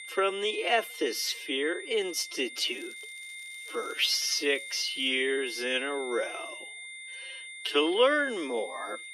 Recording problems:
wrong speed, natural pitch; too slow; 0.6 times normal speed
thin; somewhat; fading below 300 Hz
high-pitched whine; noticeable; throughout; 2 kHz, 10 dB below the speech
crackling; faint; from 2.5 to 5 s; 25 dB below the speech

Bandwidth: 14.5 kHz